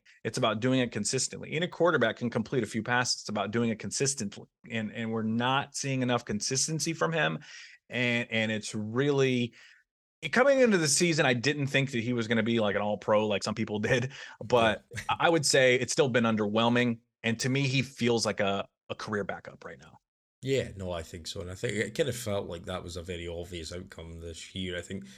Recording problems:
uneven, jittery; strongly; from 4.5 to 25 s

